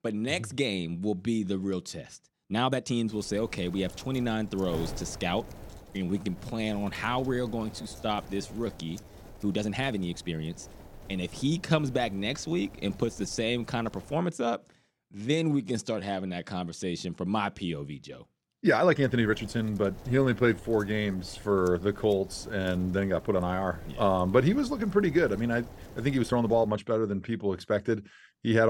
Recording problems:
wind noise on the microphone; occasional gusts; from 3 to 14 s and from 19 to 27 s; 20 dB below the speech
uneven, jittery; strongly; from 2.5 to 27 s
abrupt cut into speech; at the end

